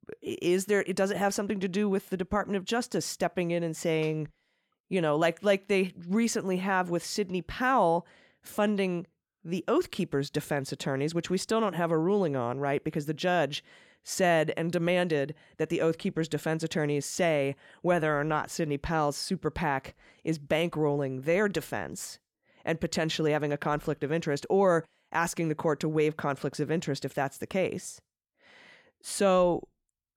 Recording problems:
none

